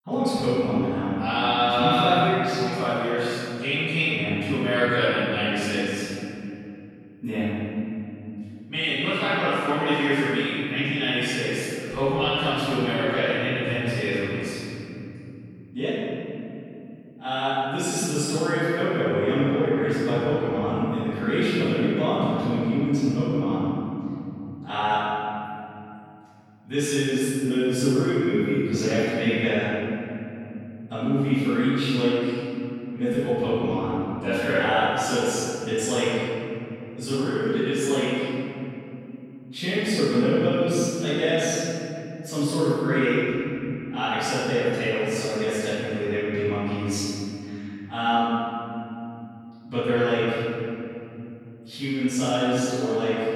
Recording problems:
room echo; strong; dies away in 3 s
off-mic speech; far

